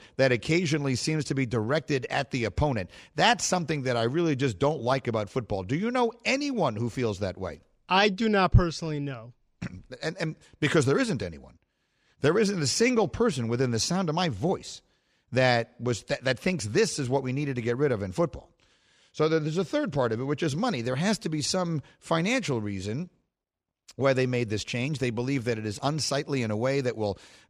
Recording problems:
none

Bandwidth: 15 kHz